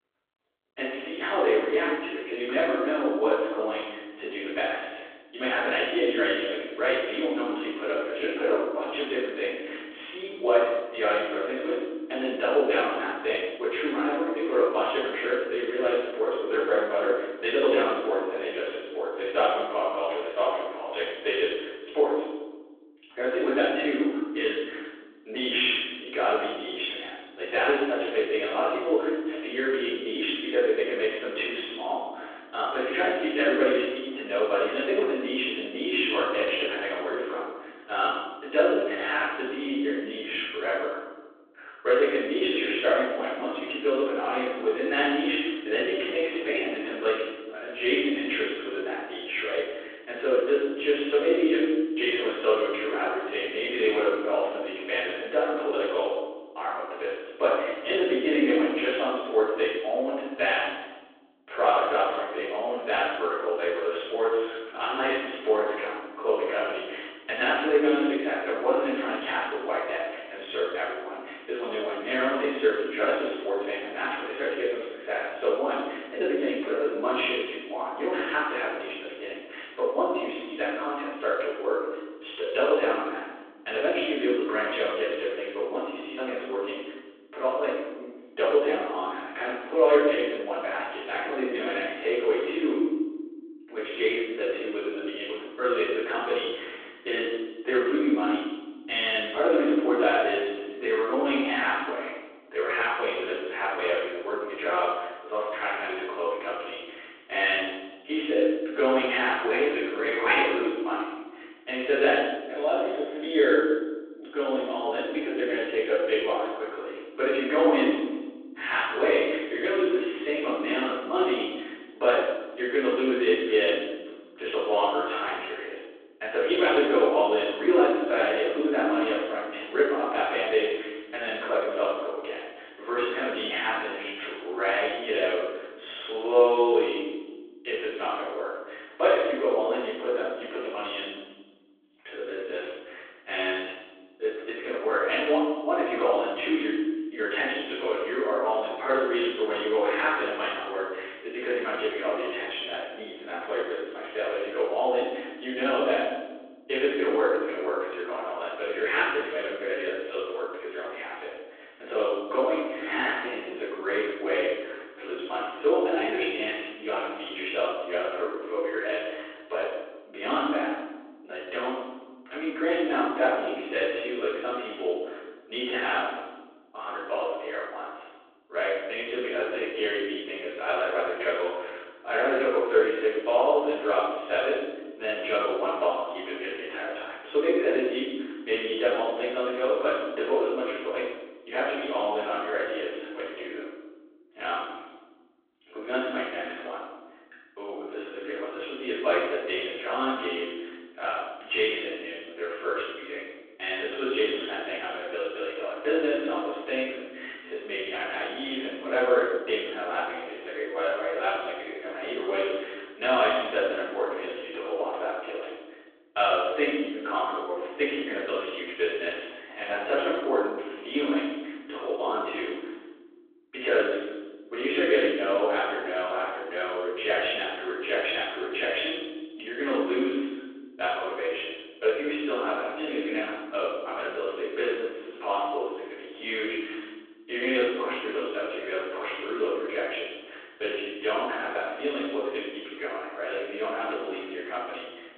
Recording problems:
room echo; strong; dies away in 1.2 s
off-mic speech; far
phone-call audio; nothing above 3.5 kHz
muffled; very slightly; fading above 2.5 kHz

